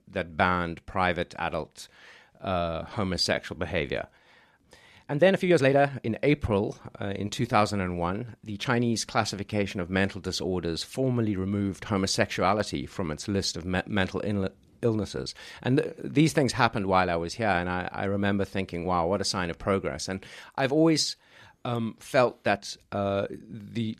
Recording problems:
uneven, jittery; strongly; from 2.5 to 23 s

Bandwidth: 14 kHz